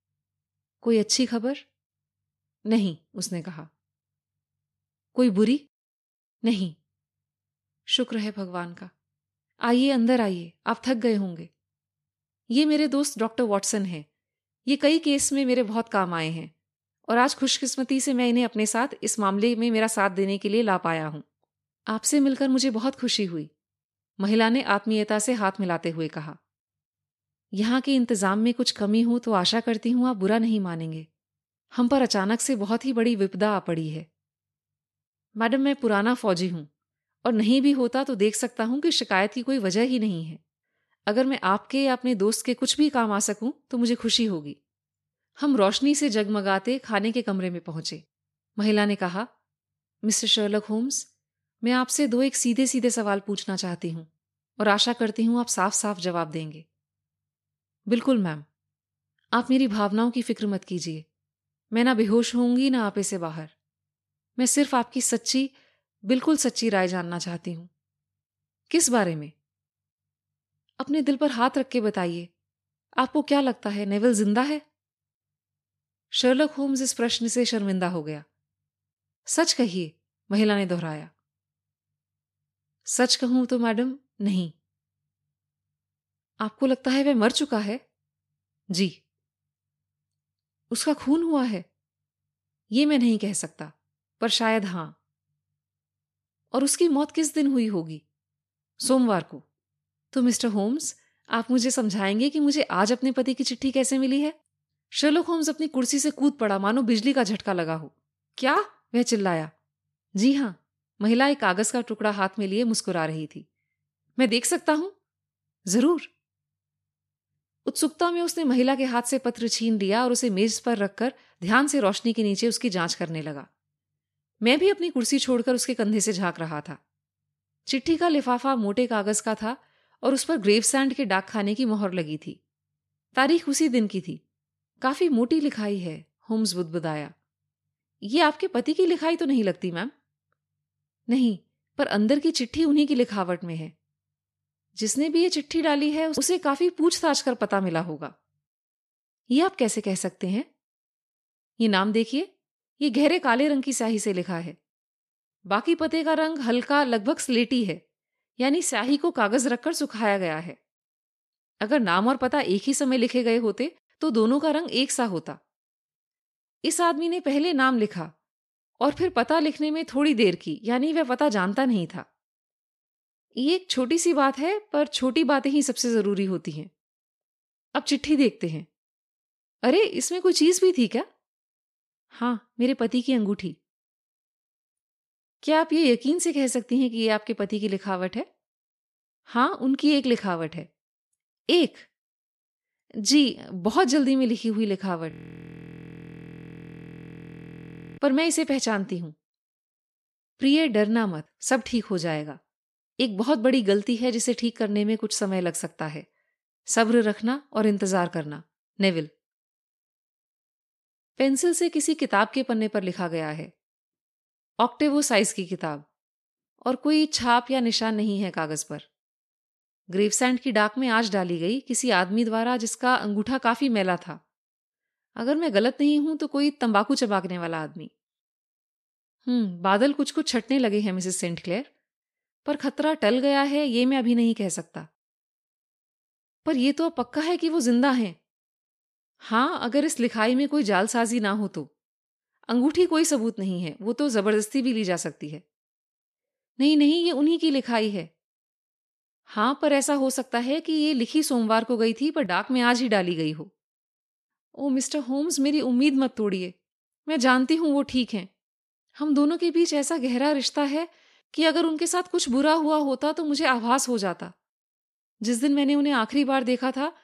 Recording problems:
audio freezing; at 3:15 for 3 s

